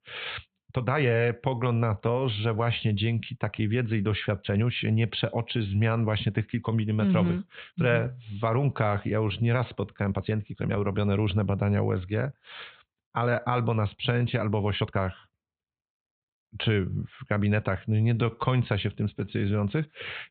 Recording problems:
high frequencies cut off; severe; nothing above 4 kHz
uneven, jittery; strongly; from 0.5 to 20 s

